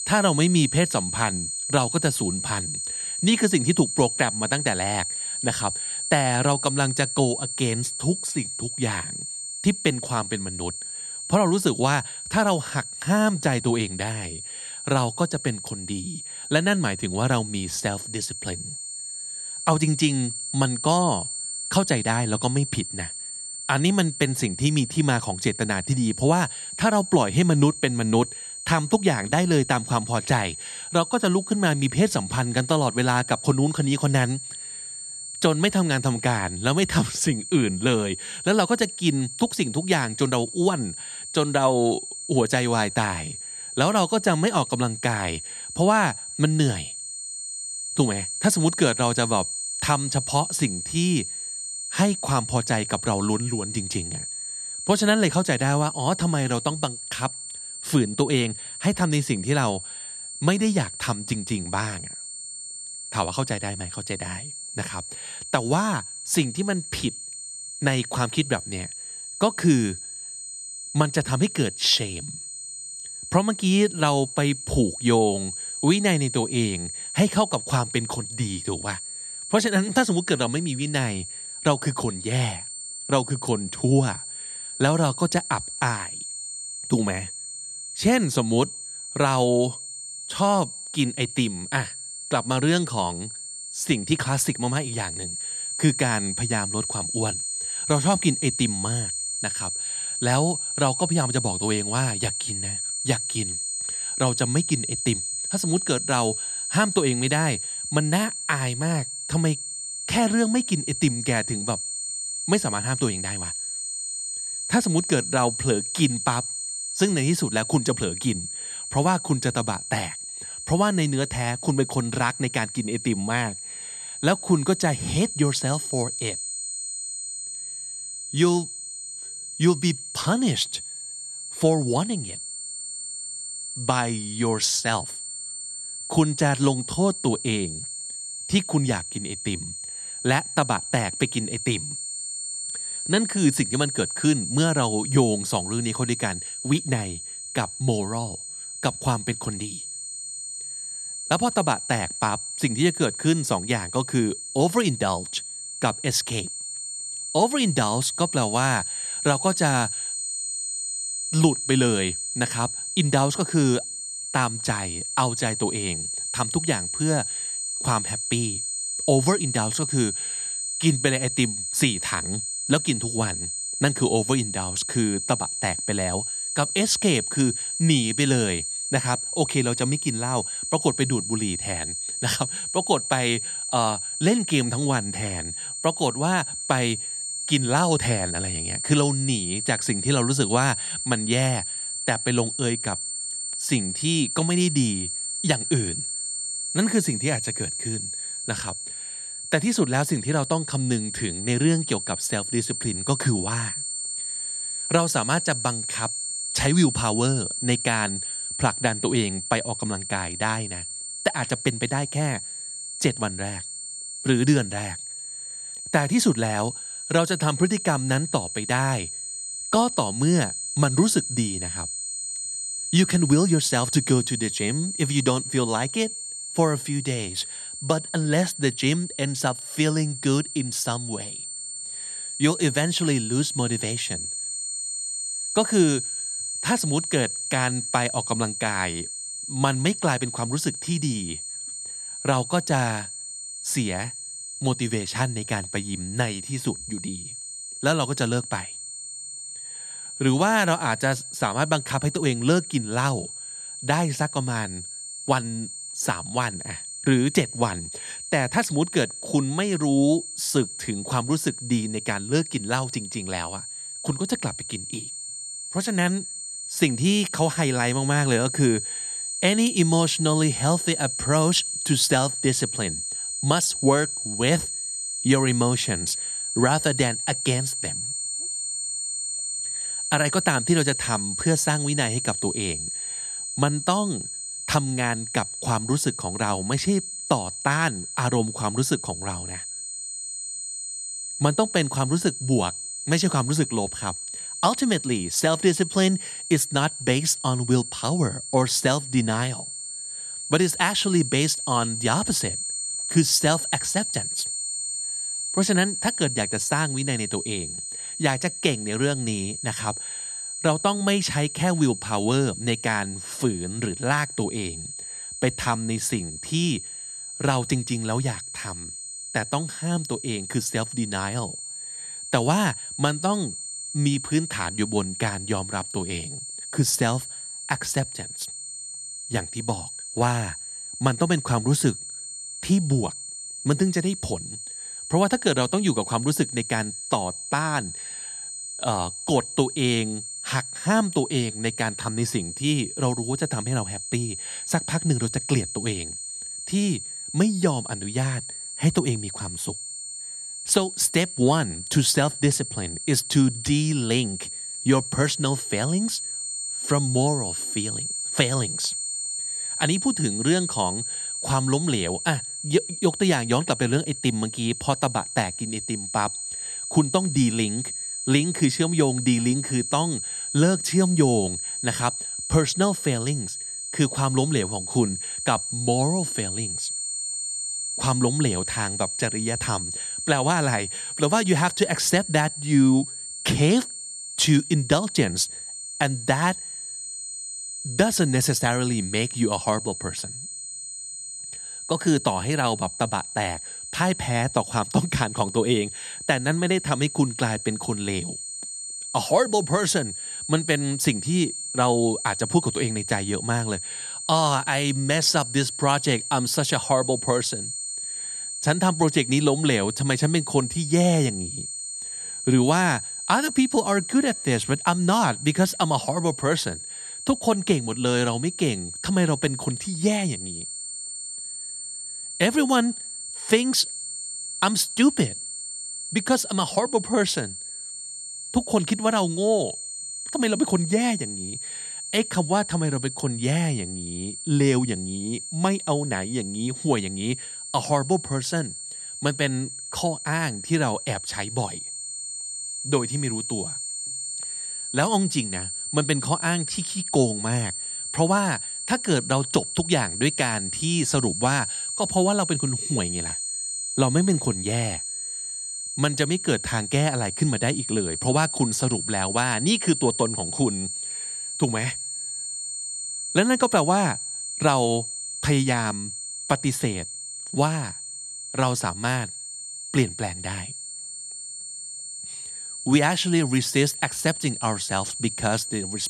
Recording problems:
high-pitched whine; loud; throughout; 8 kHz, 6 dB below the speech

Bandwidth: 14 kHz